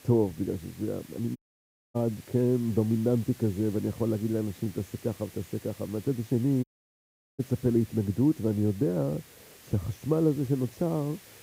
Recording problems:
muffled; very; fading above 1 kHz
hiss; faint; throughout; 20 dB below the speech
audio cutting out; at 1.5 s for 0.5 s and at 6.5 s for 0.5 s

